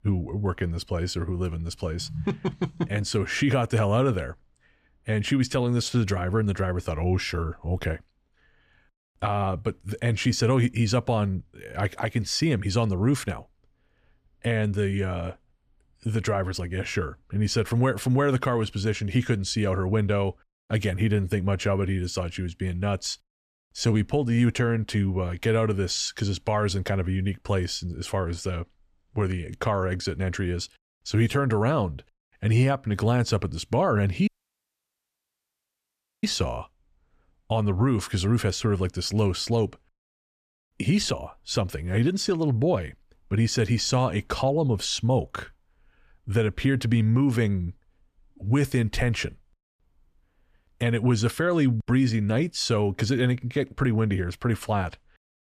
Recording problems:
audio cutting out; at 34 s for 2 s

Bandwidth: 14.5 kHz